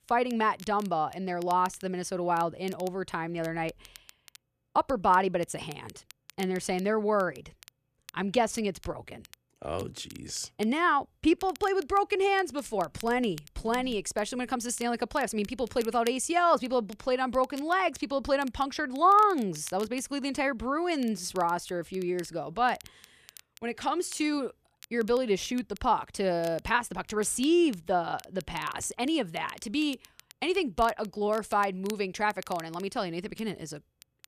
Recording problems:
crackle, like an old record; faint; 20 dB below the speech

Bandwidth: 14.5 kHz